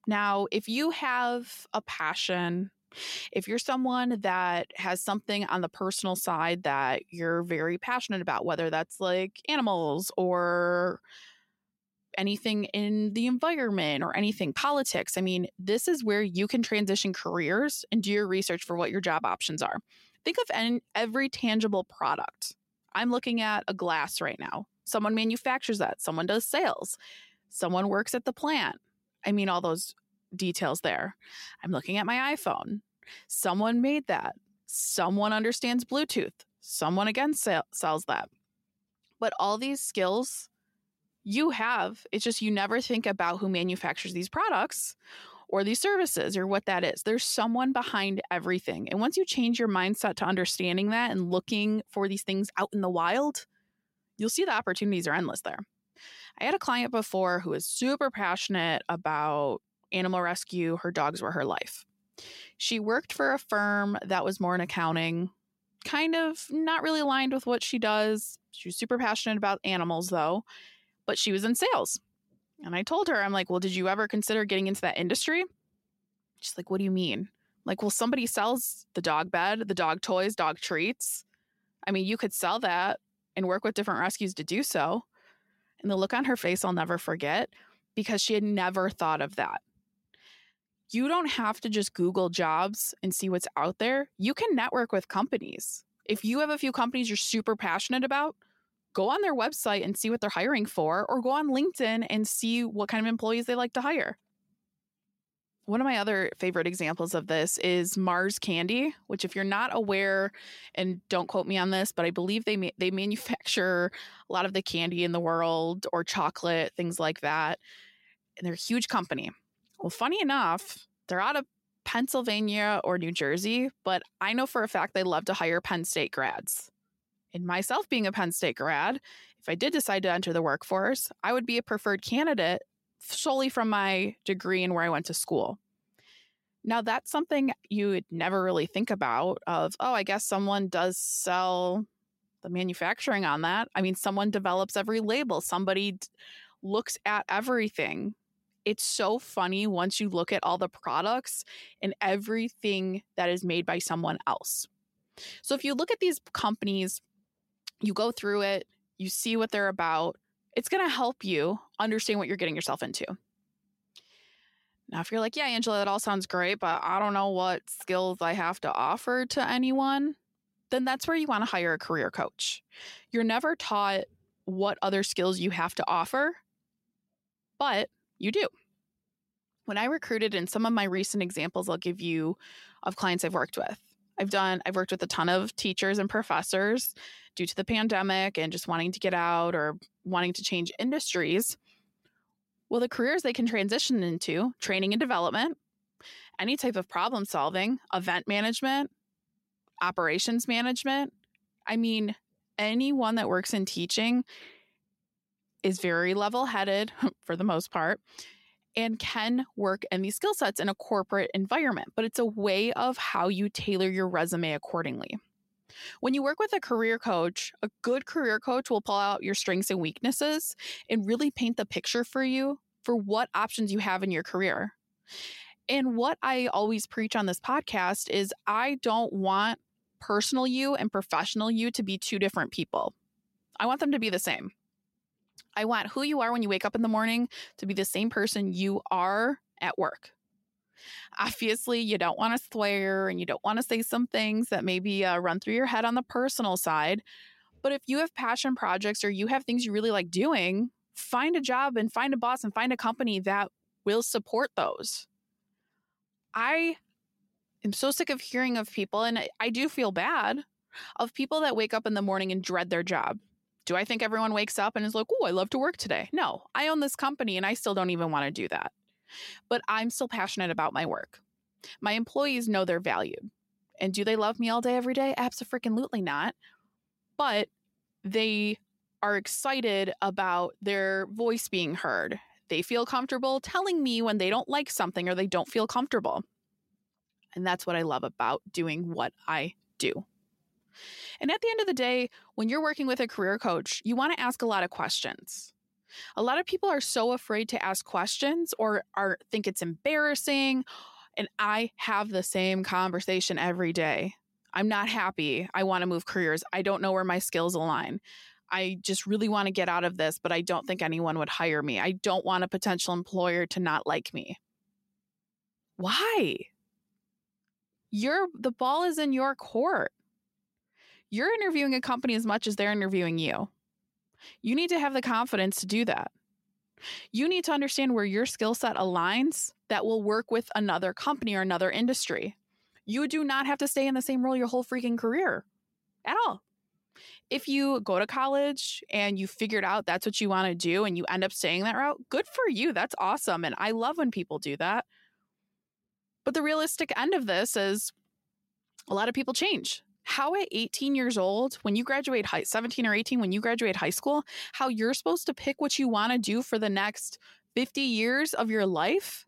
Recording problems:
none

